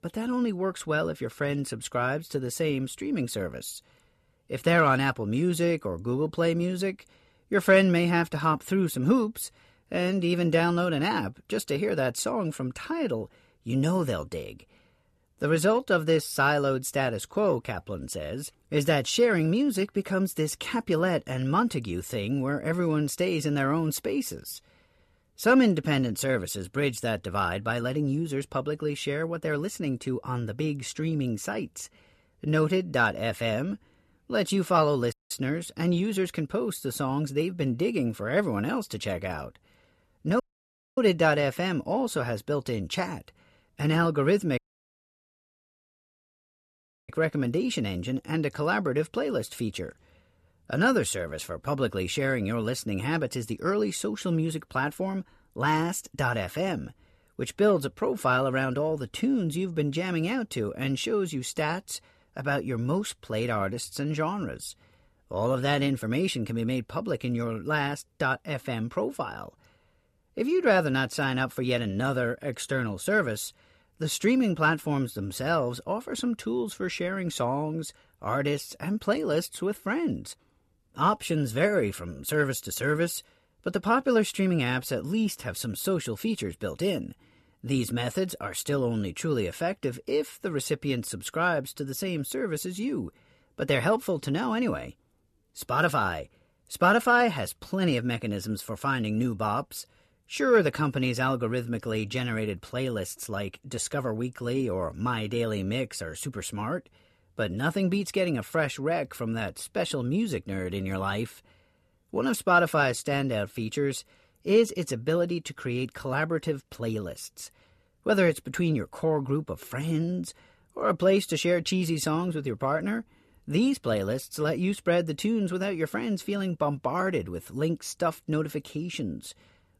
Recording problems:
audio cutting out; at 35 s, at 40 s for 0.5 s and at 45 s for 2.5 s

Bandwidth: 13.5 kHz